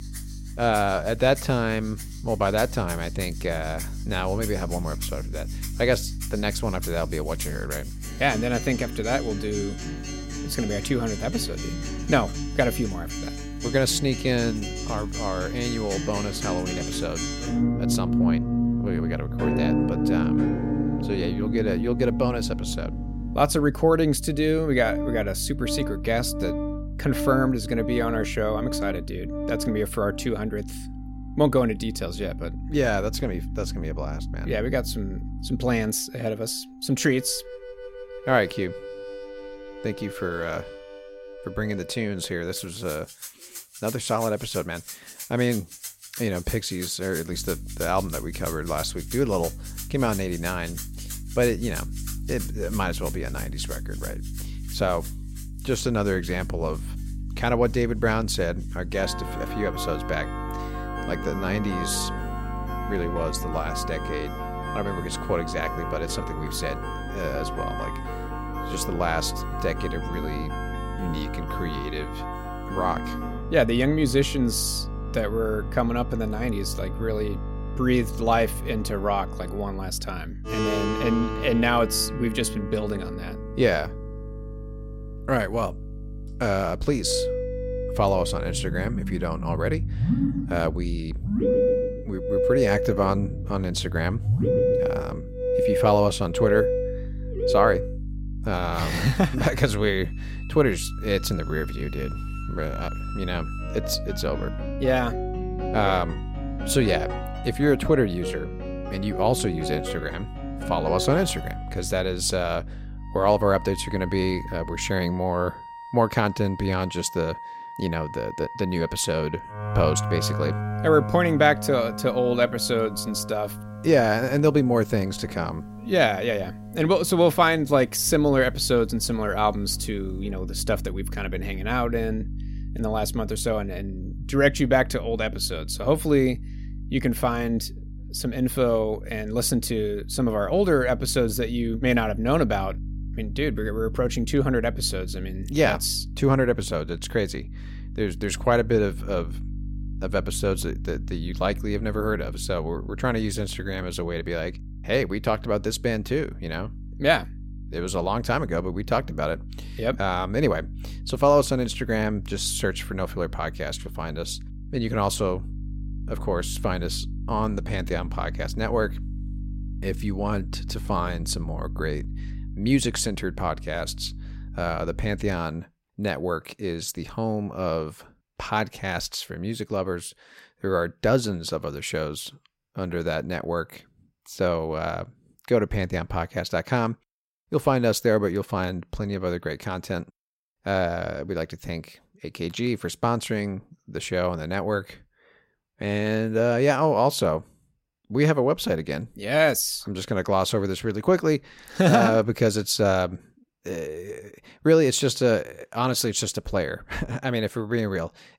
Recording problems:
background music; loud; until 2:10; 6 dB below the speech
electrical hum; faint; until 36 s, from 47 s to 1:55 and from 2:08 to 2:55; 50 Hz, 25 dB below the speech

